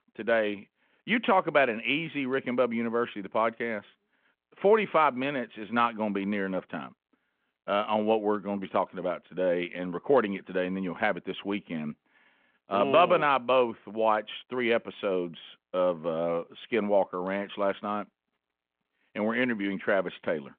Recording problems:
phone-call audio

